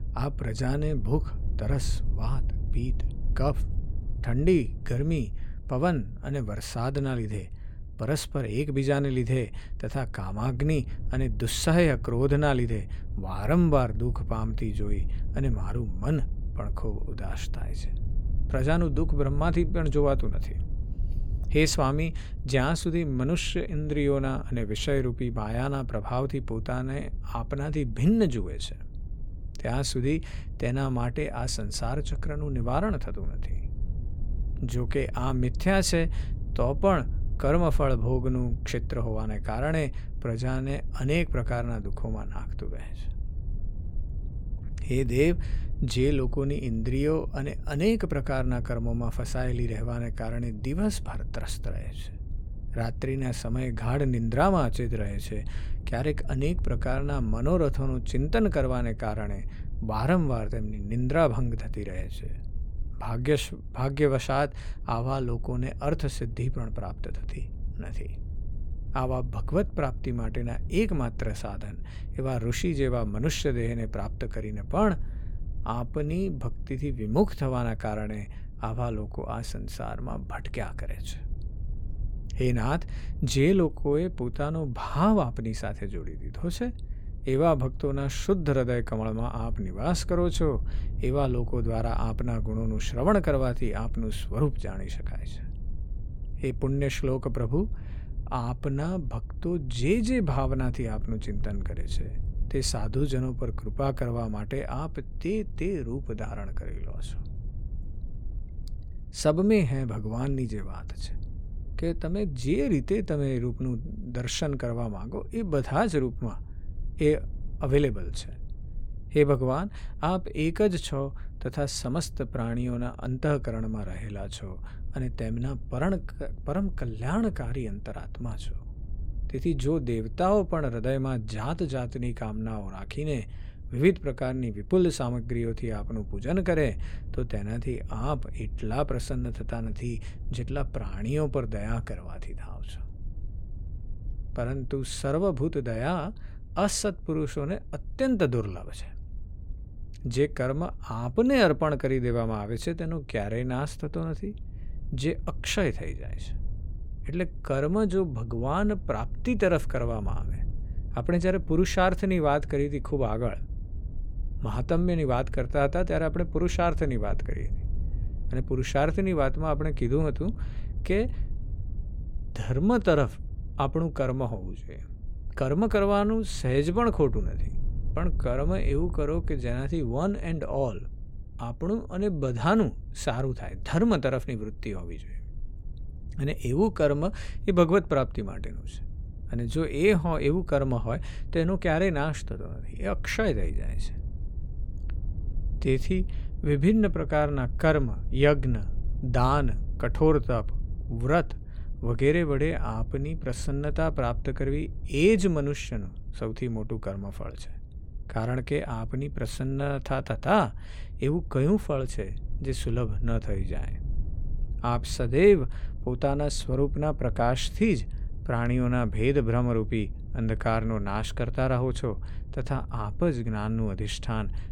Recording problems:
low rumble; faint; throughout; 25 dB below the speech

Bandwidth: 17.5 kHz